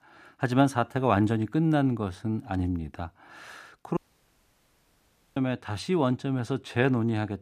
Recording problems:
audio cutting out; at 4 s for 1.5 s

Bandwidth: 14.5 kHz